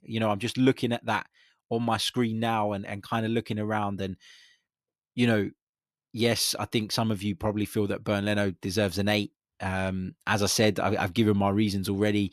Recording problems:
none

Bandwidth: 14 kHz